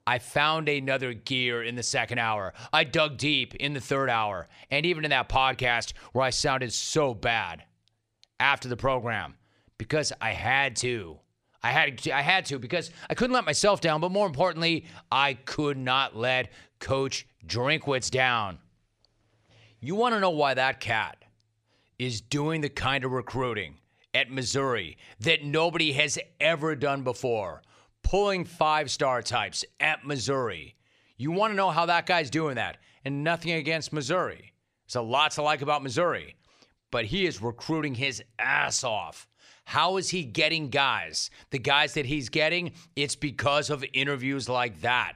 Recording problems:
none

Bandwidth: 14.5 kHz